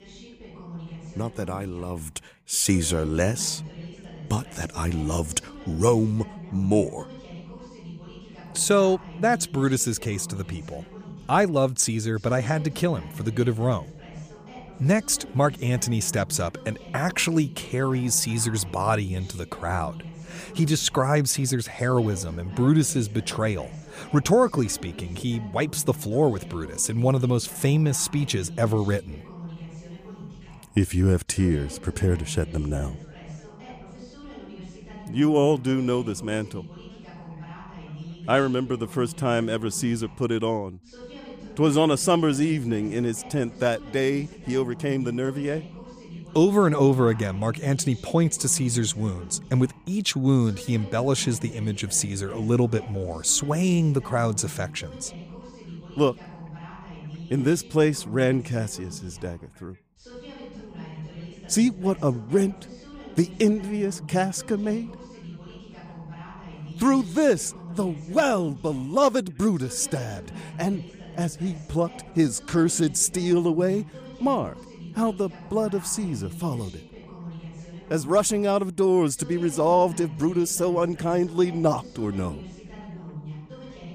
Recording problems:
background chatter; noticeable; throughout; 2 voices, 15 dB below the speech

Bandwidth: 15 kHz